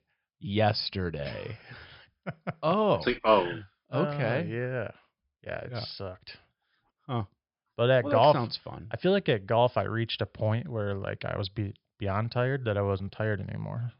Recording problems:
high frequencies cut off; noticeable; nothing above 5.5 kHz

